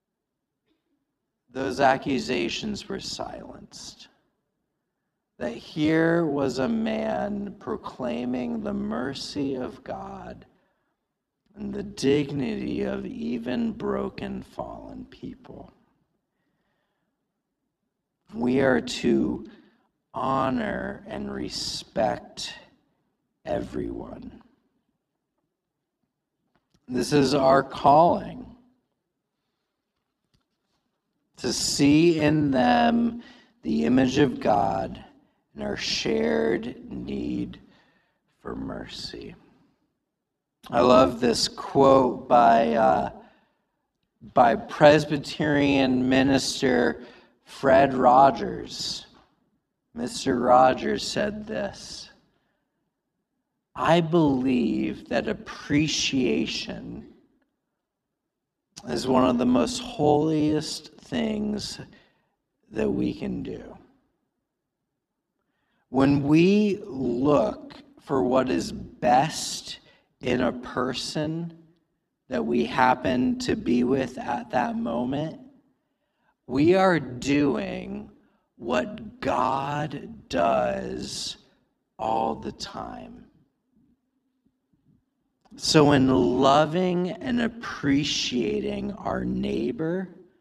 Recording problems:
wrong speed, natural pitch; too slow; 0.7 times normal speed

